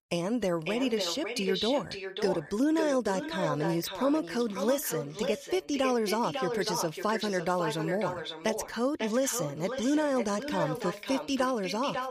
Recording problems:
echo of what is said; strong; throughout; 550 ms later, 6 dB below the speech

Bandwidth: 15 kHz